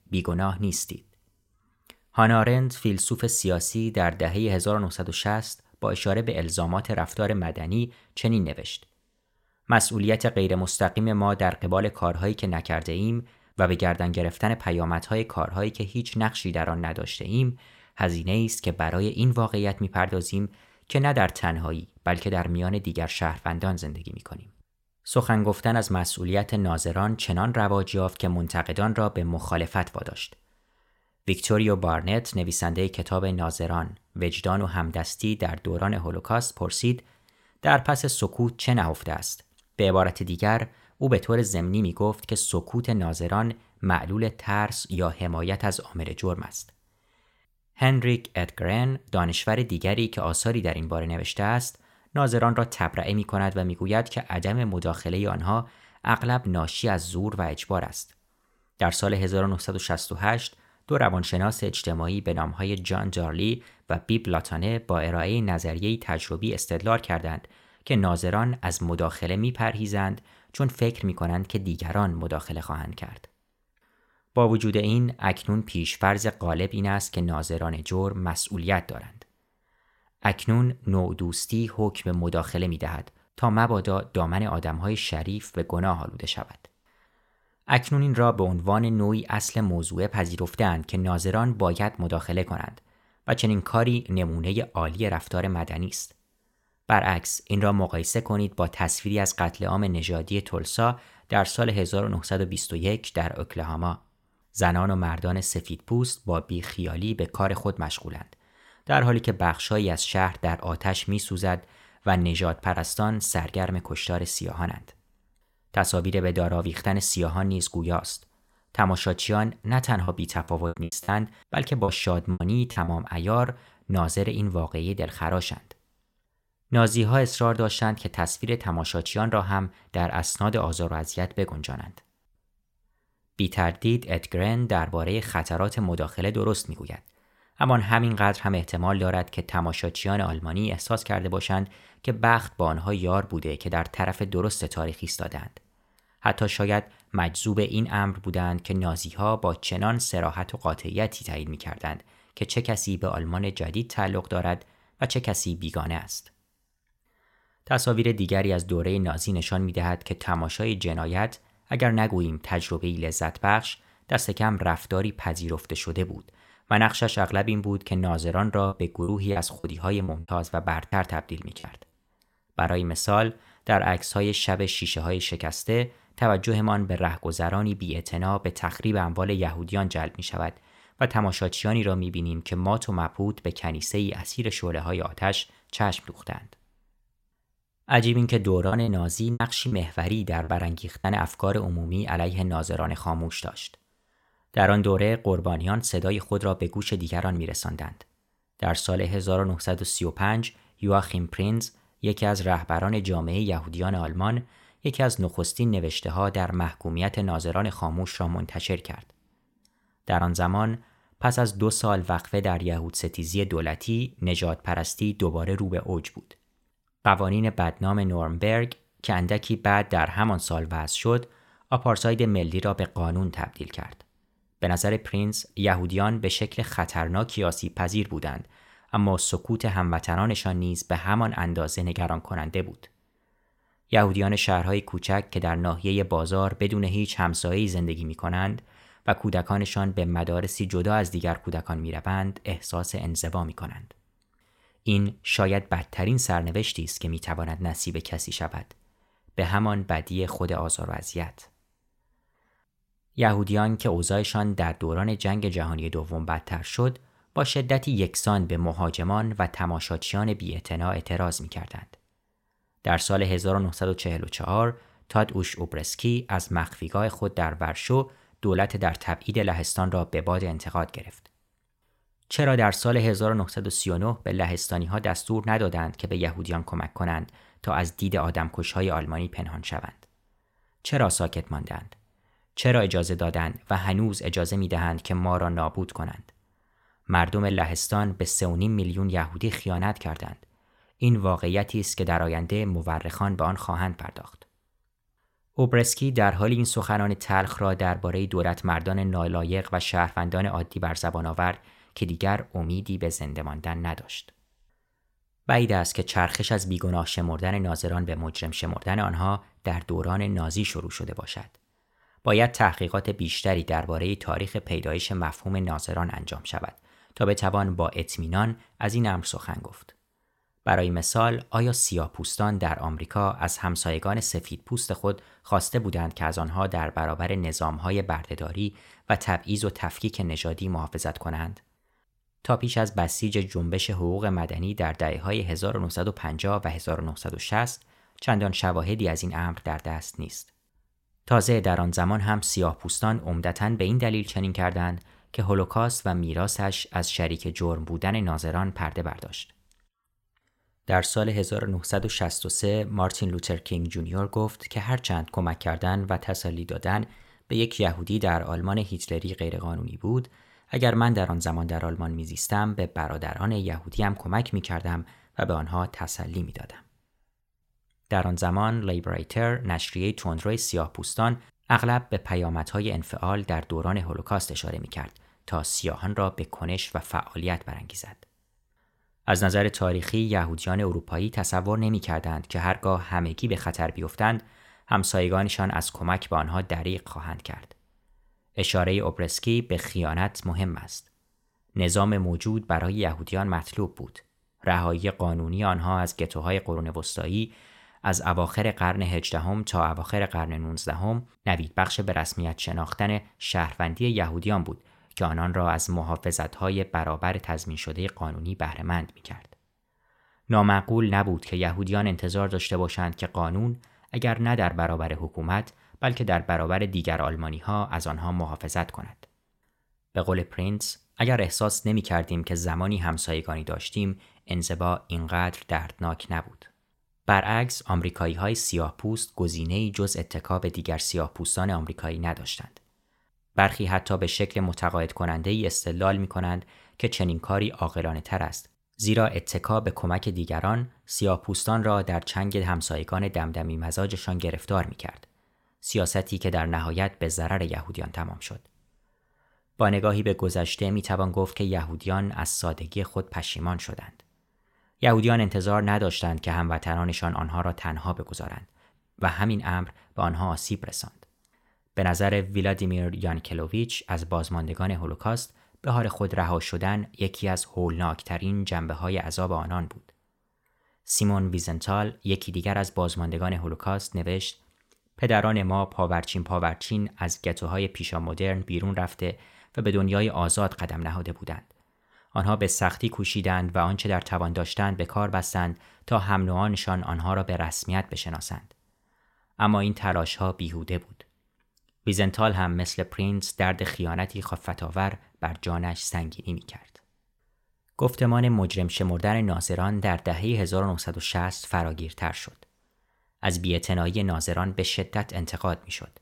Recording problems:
choppy; very; from 2:00 to 2:03, from 2:49 to 2:52 and from 3:09 to 3:11; 12% of the speech affected

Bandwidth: 16.5 kHz